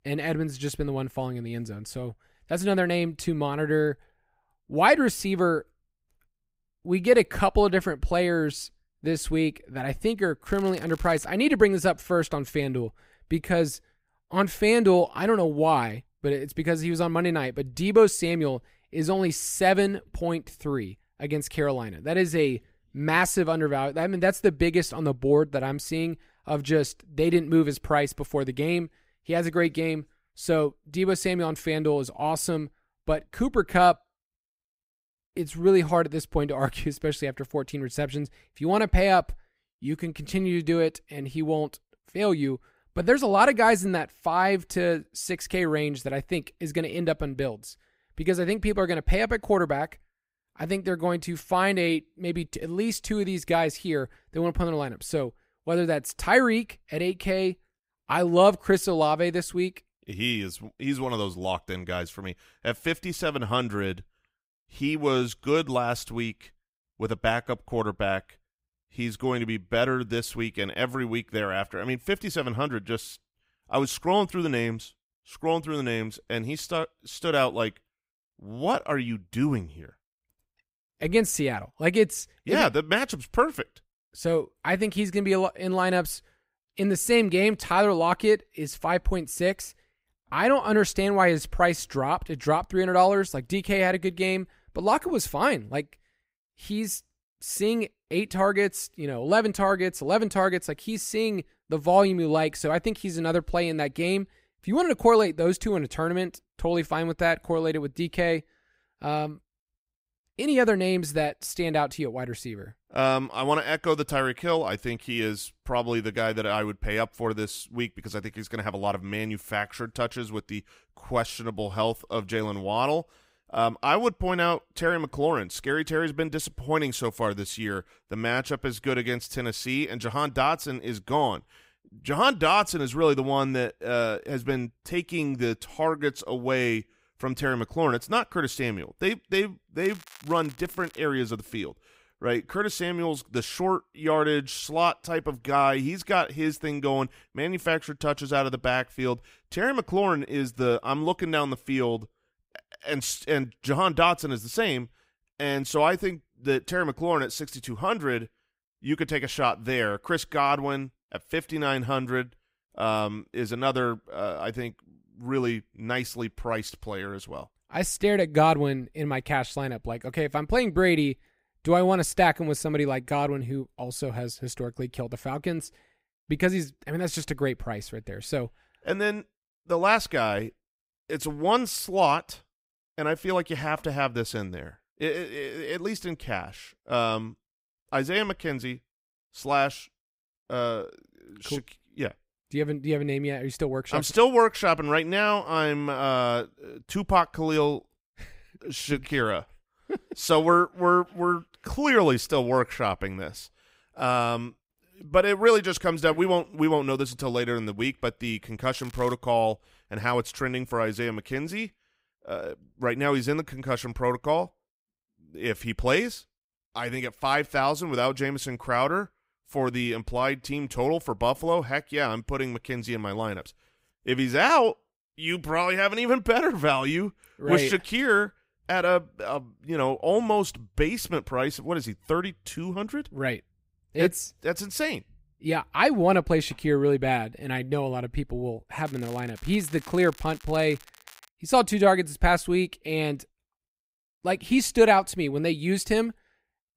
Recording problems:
crackling; faint; 4 times, first at 10 s; 25 dB below the speech

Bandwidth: 15.5 kHz